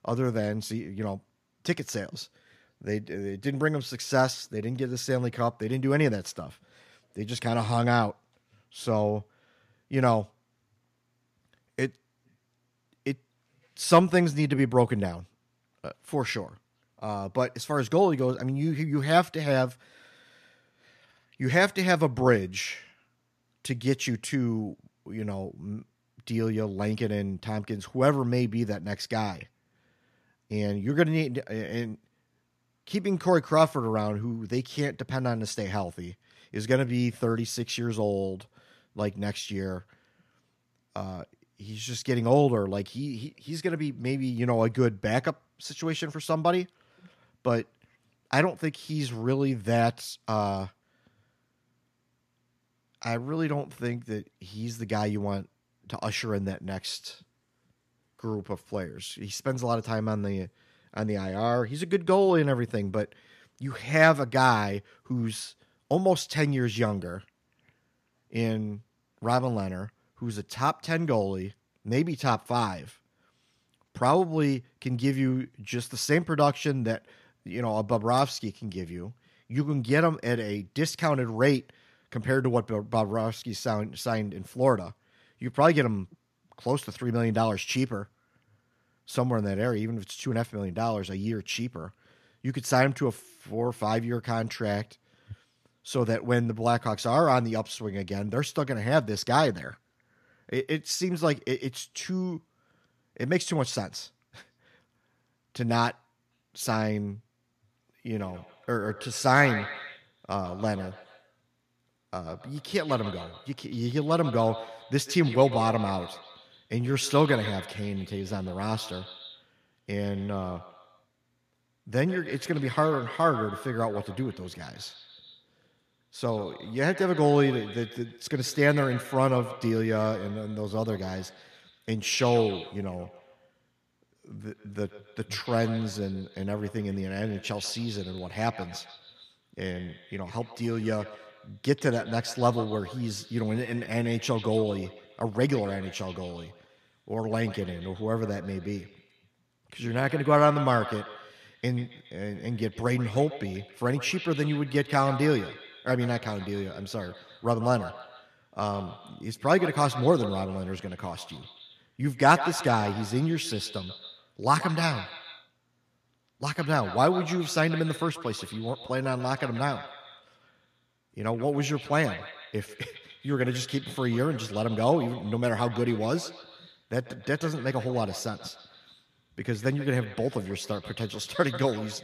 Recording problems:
echo of what is said; noticeable; from 1:48 on; 140 ms later, 15 dB below the speech

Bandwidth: 14.5 kHz